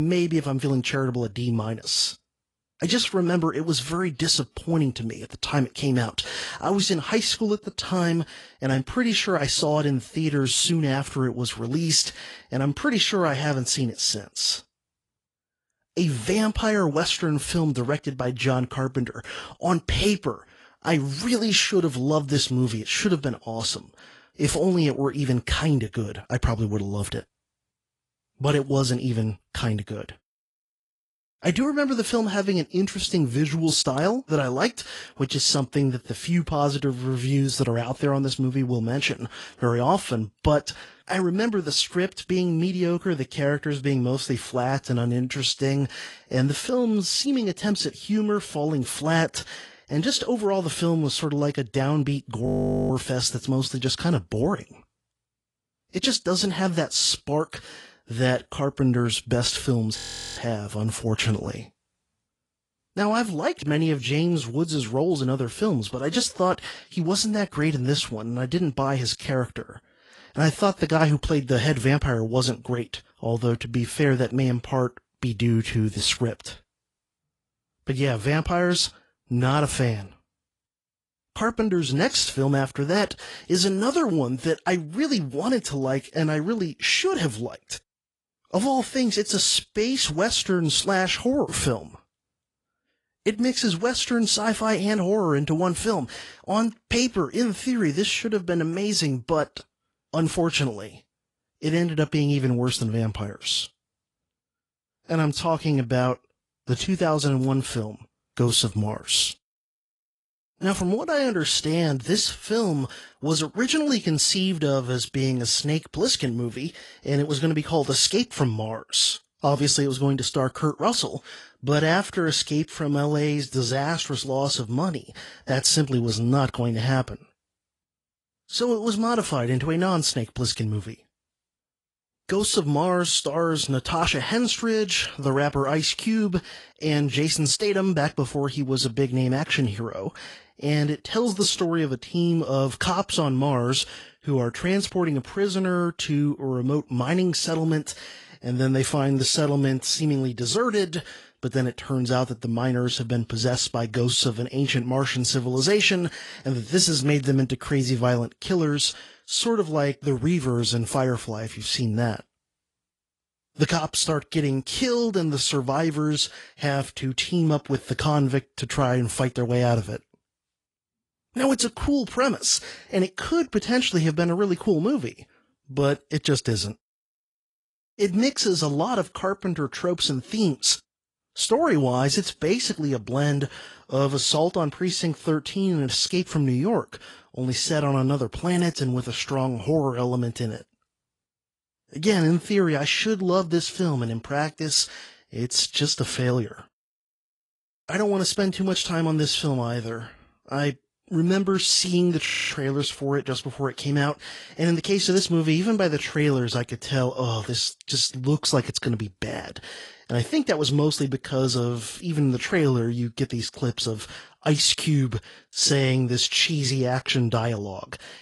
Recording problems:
garbled, watery; slightly; nothing above 10.5 kHz
abrupt cut into speech; at the start
audio freezing; at 52 s, at 1:00 and at 3:22

